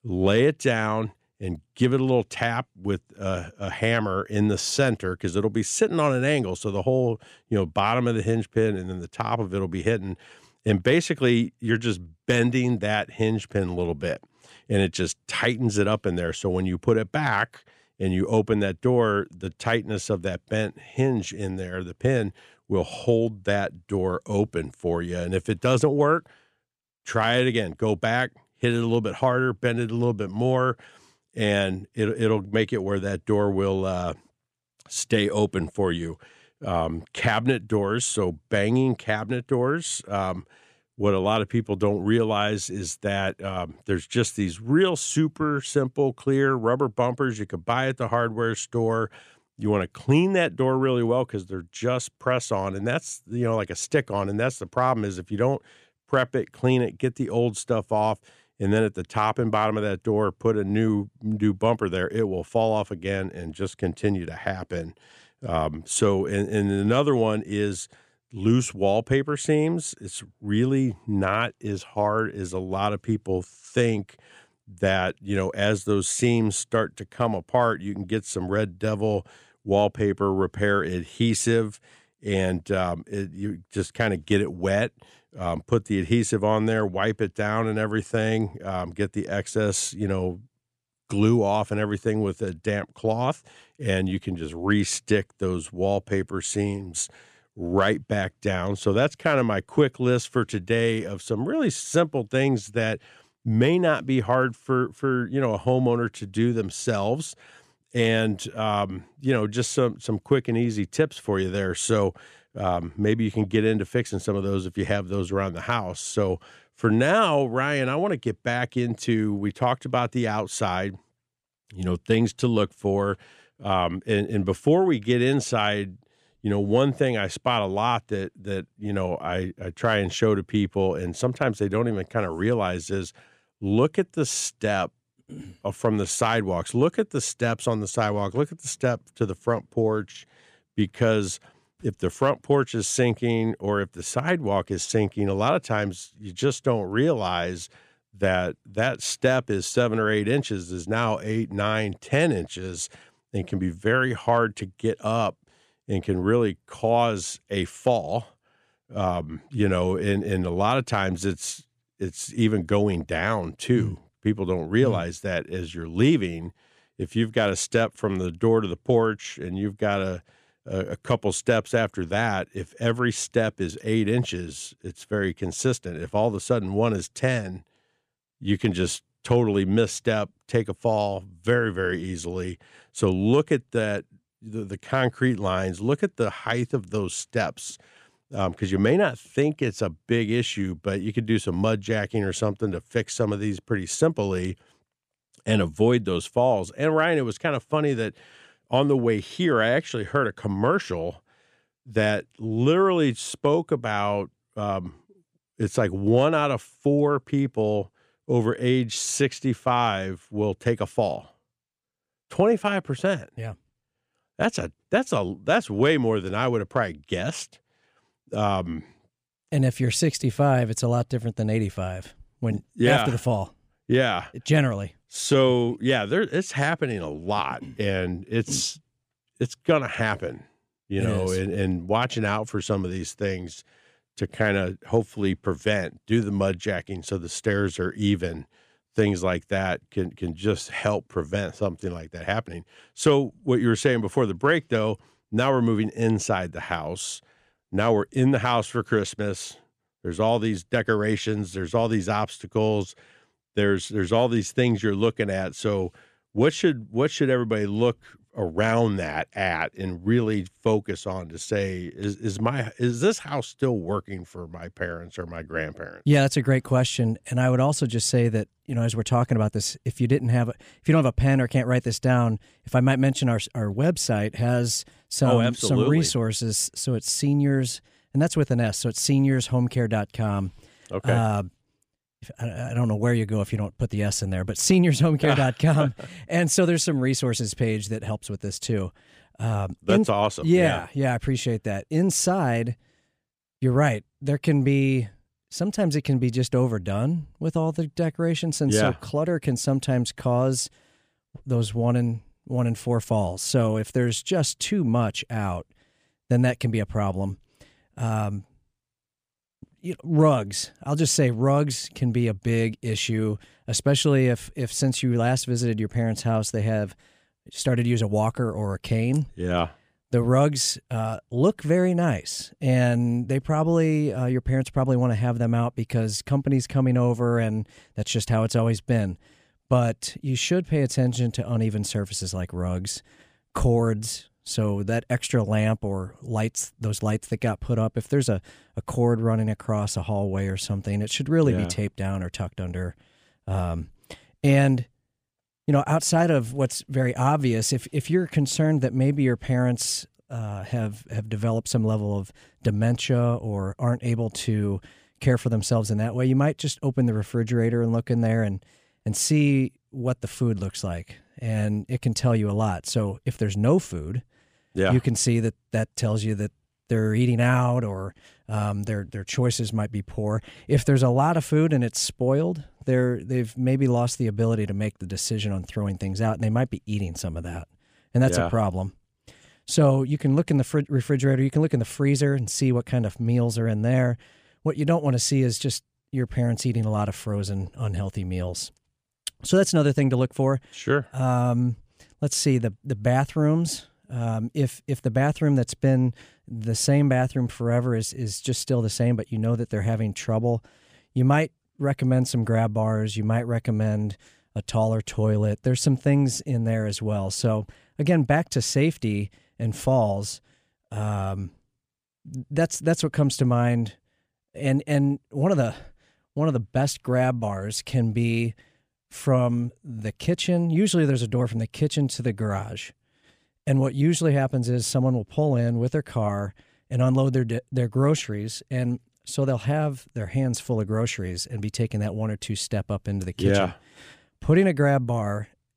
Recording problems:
none

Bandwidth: 15 kHz